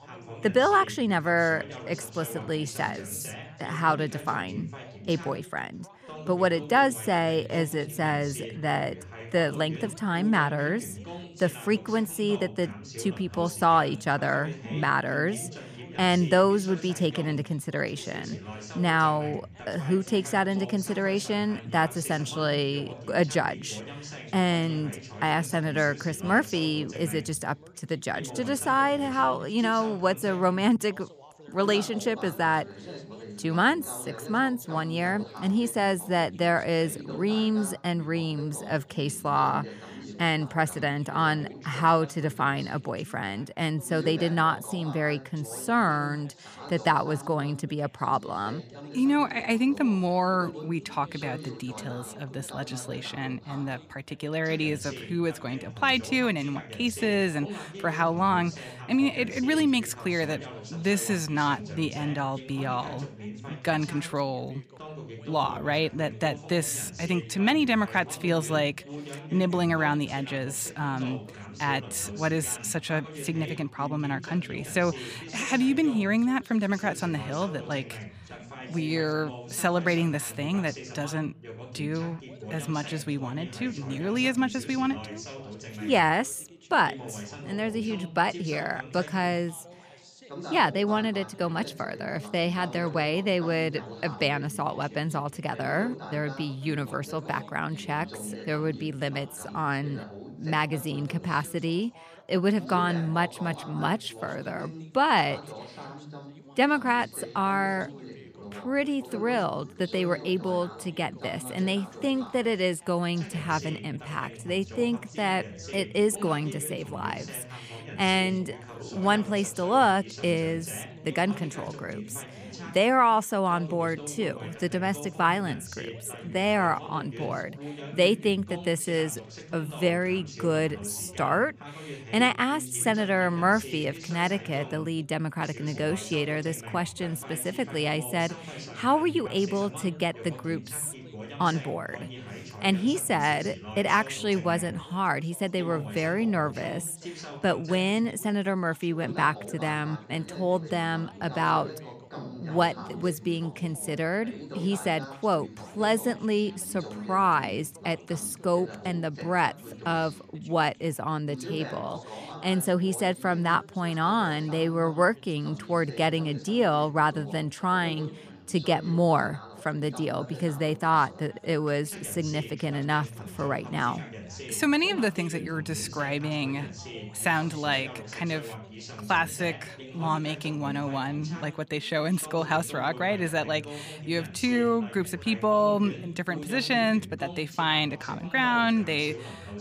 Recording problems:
background chatter; noticeable; throughout; 2 voices, 15 dB below the speech

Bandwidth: 15 kHz